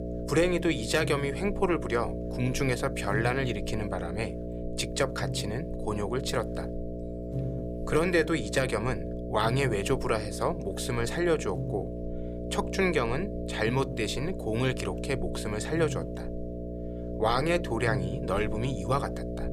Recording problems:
electrical hum; loud; throughout; 60 Hz, 9 dB below the speech

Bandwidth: 15.5 kHz